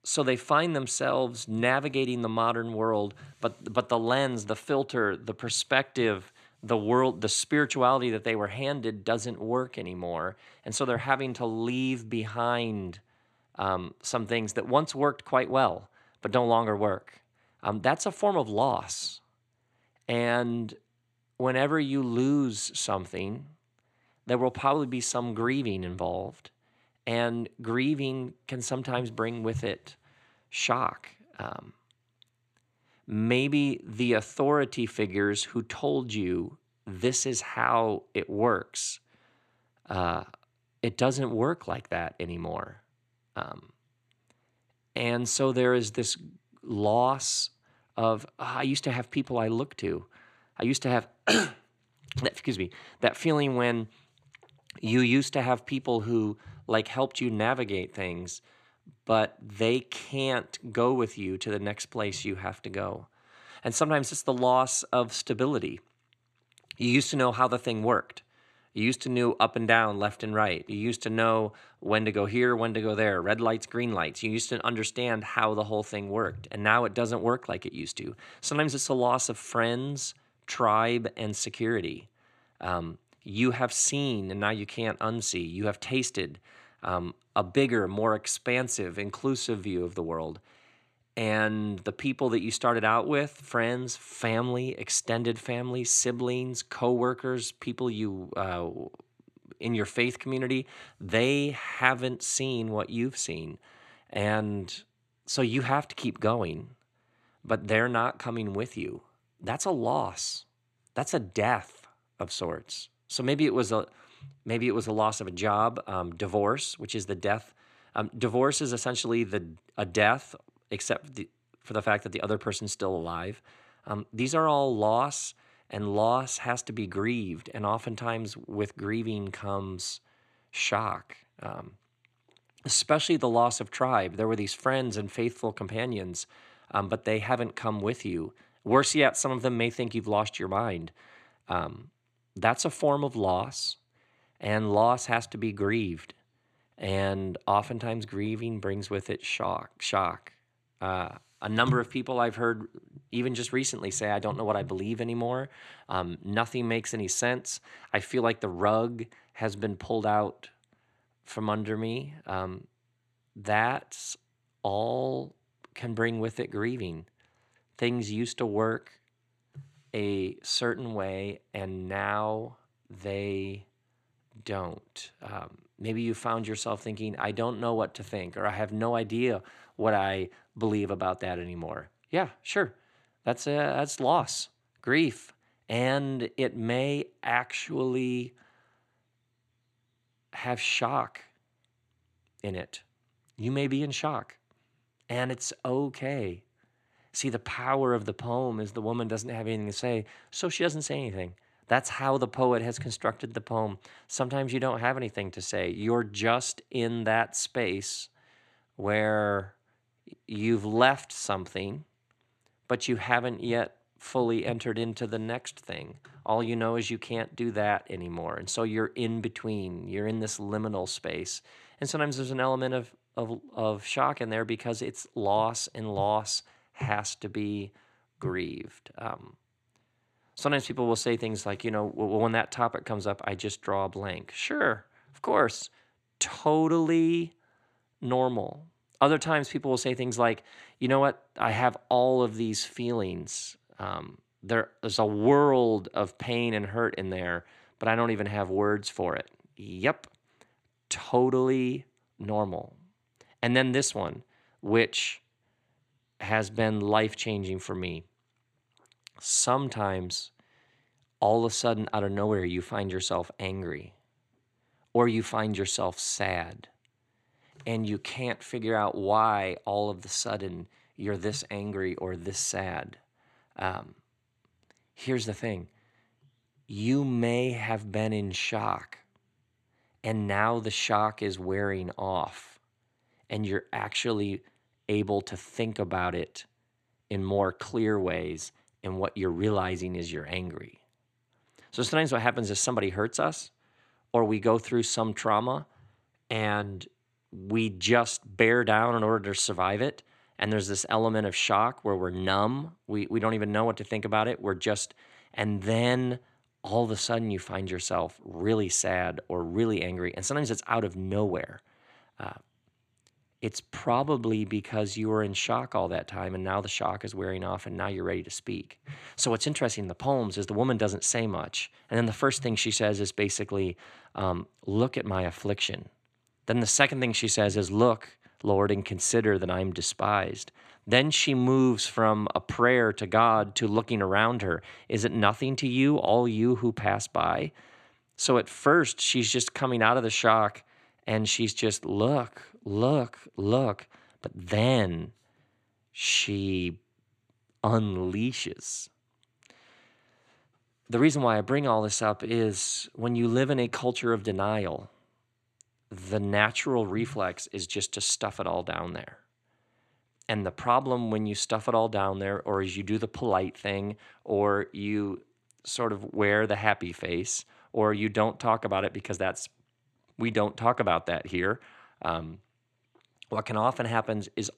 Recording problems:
none

